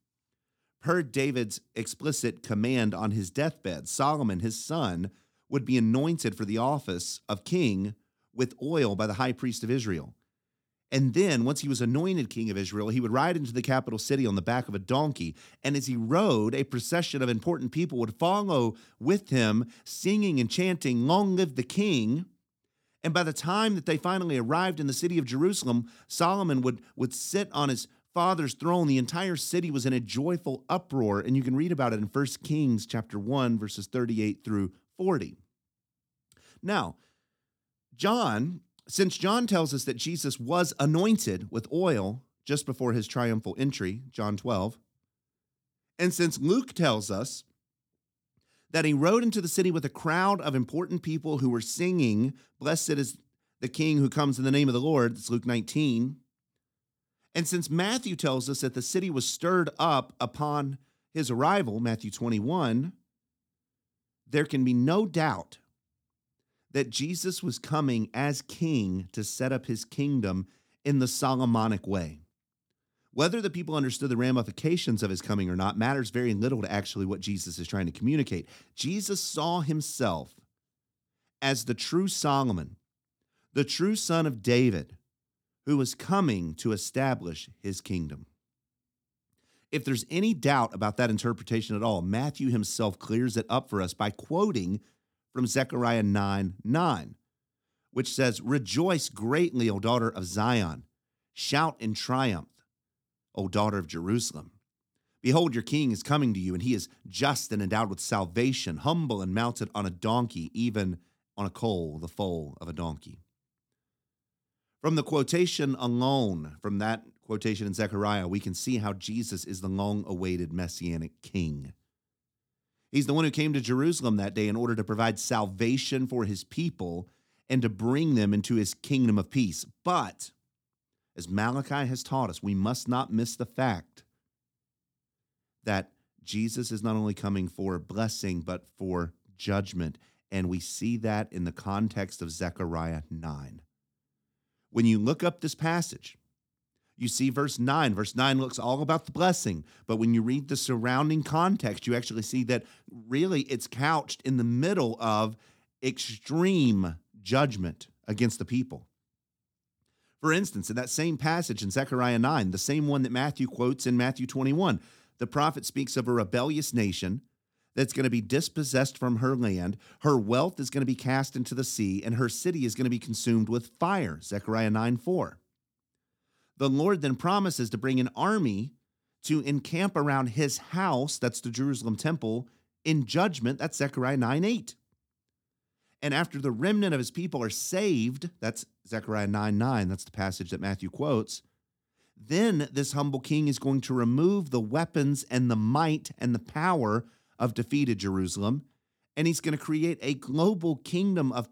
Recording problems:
none

